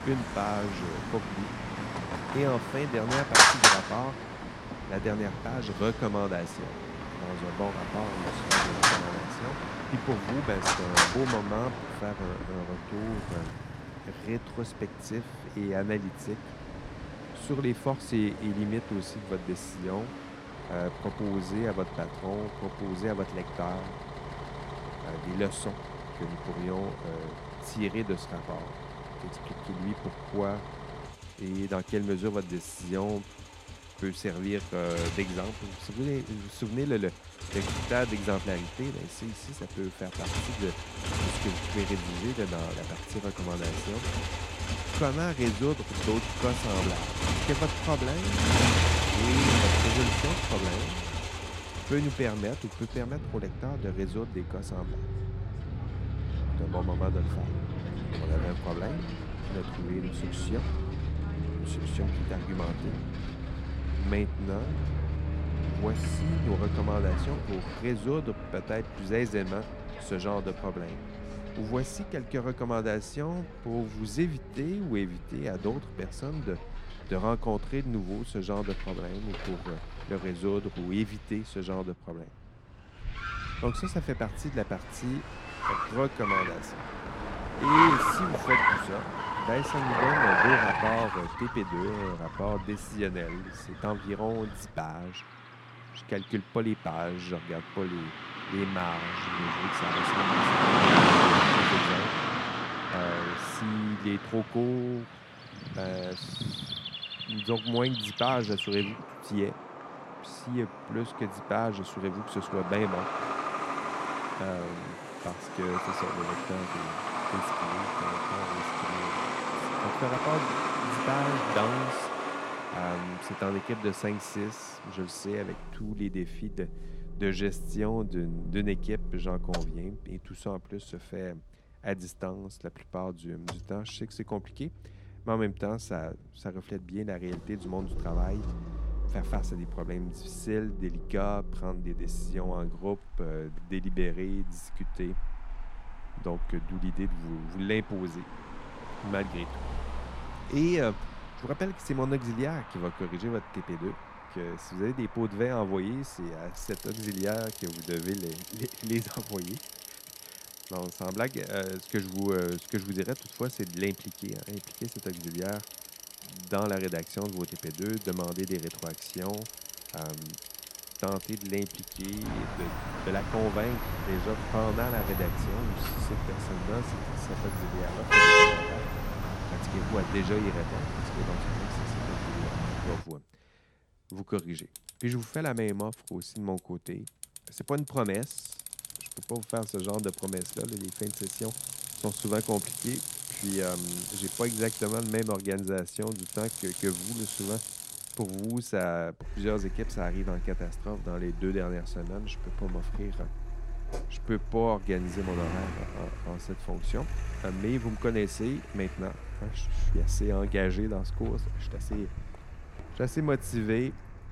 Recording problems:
traffic noise; very loud; throughout; 3 dB above the speech

